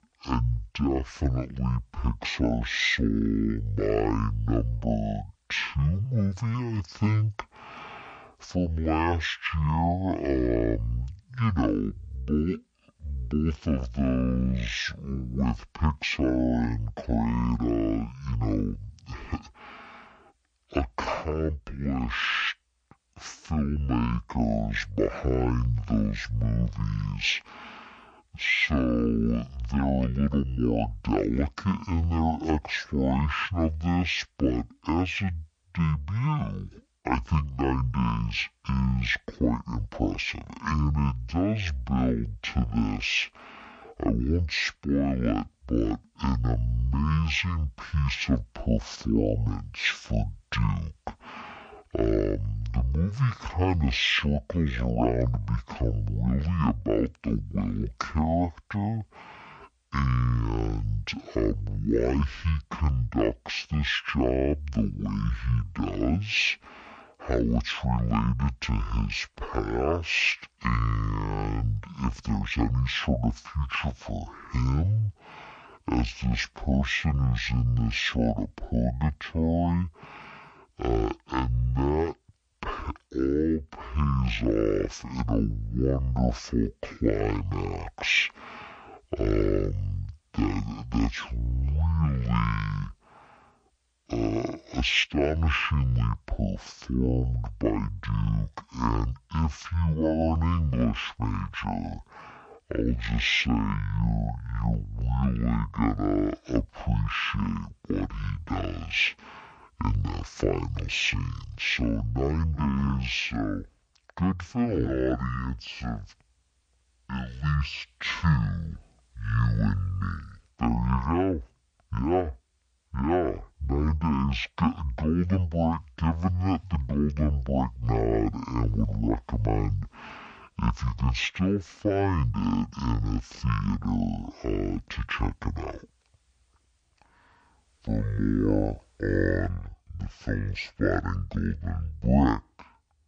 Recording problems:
wrong speed and pitch; too slow and too low; 0.5 times normal speed

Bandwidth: 9.5 kHz